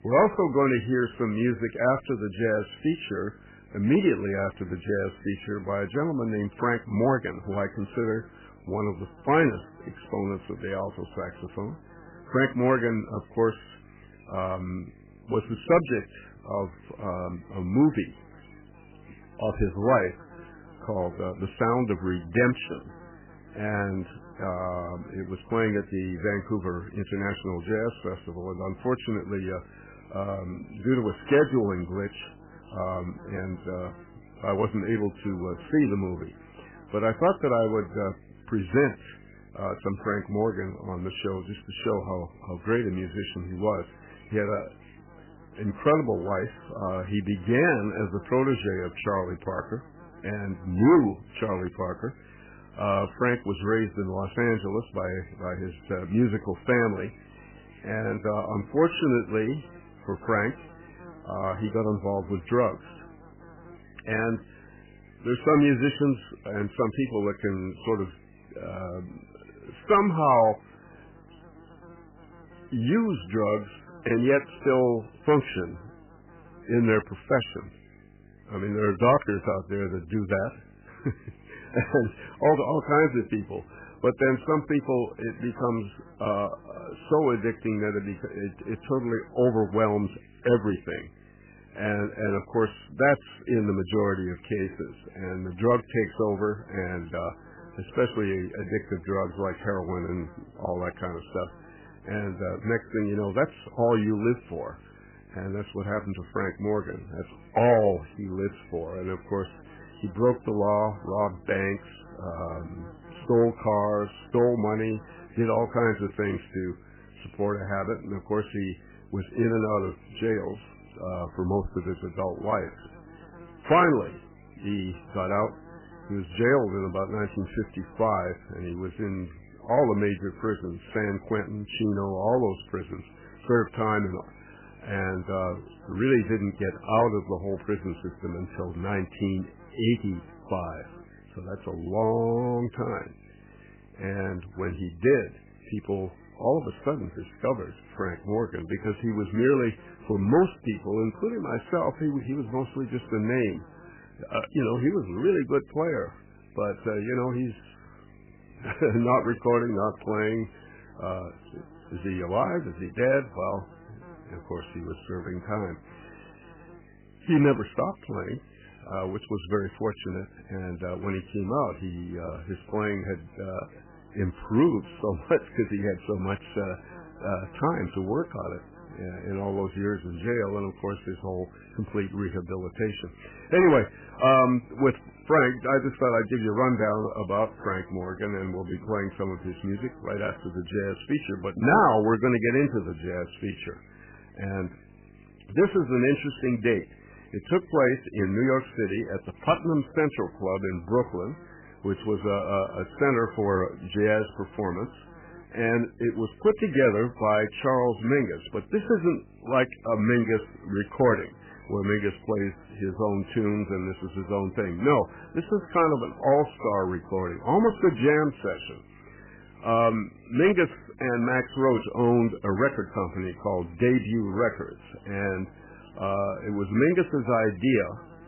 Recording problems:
garbled, watery; badly; nothing above 3 kHz
electrical hum; faint; throughout; 50 Hz, 25 dB below the speech

